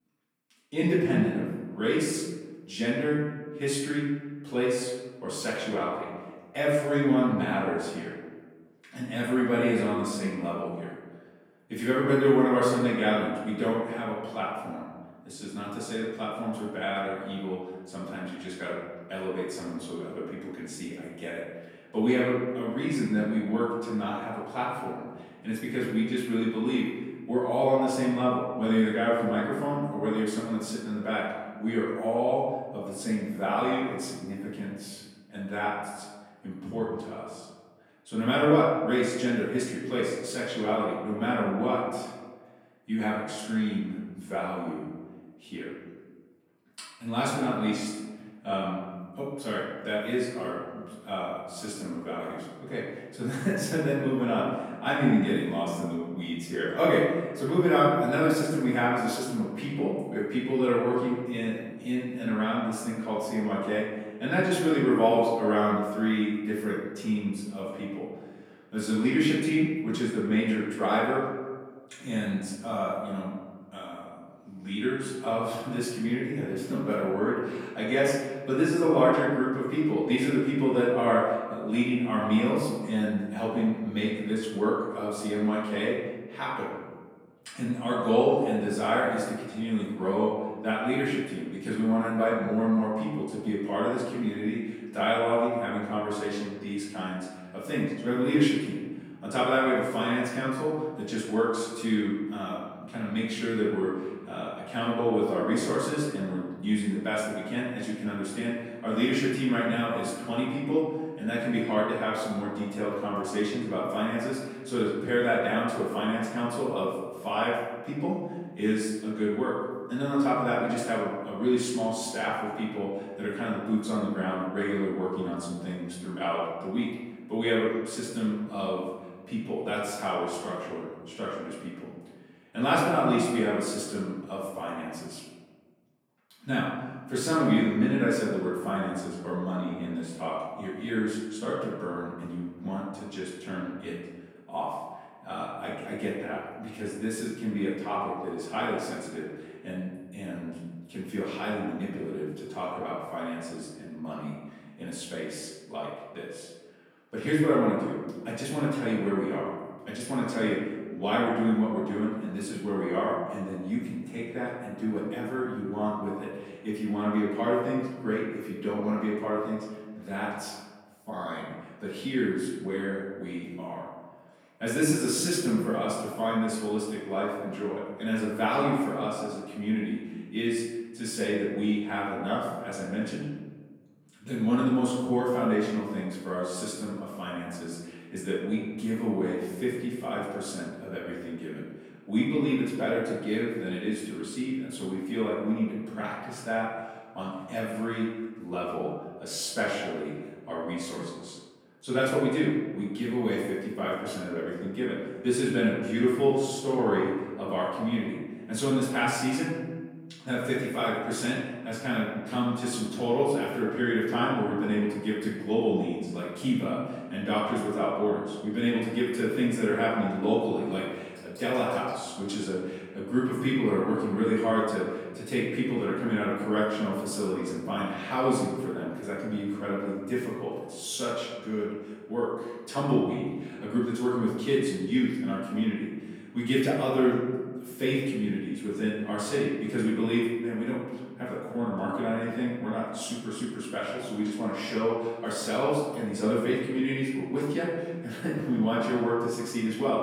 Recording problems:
off-mic speech; far
room echo; noticeable; dies away in 1.2 s

